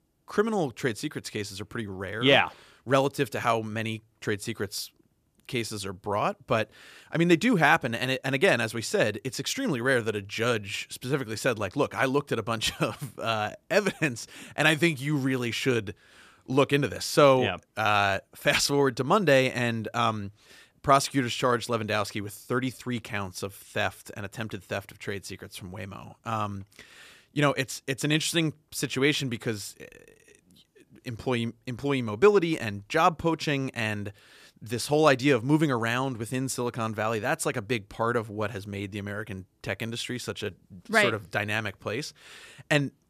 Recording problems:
none

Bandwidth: 14.5 kHz